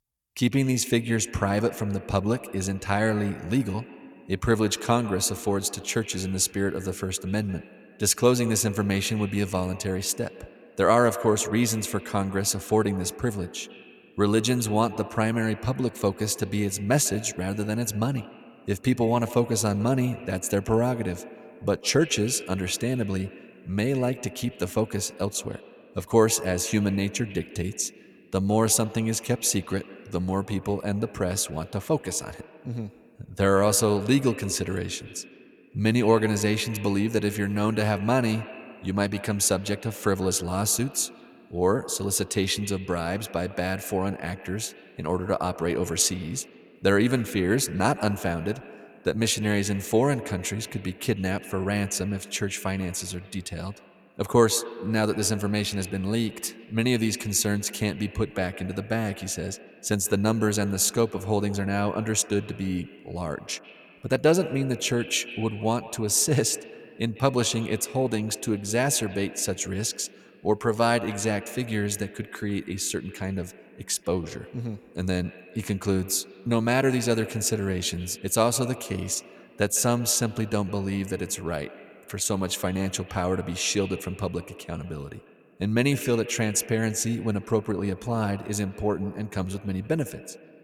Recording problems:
echo of what is said; noticeable; throughout; 150 ms later, 15 dB below the speech

